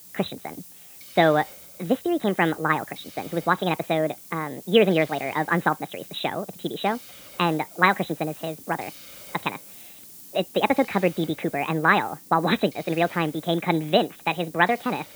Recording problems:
high frequencies cut off; severe; nothing above 4 kHz
wrong speed and pitch; too fast and too high; 1.5 times normal speed
hiss; noticeable; throughout; 20 dB below the speech

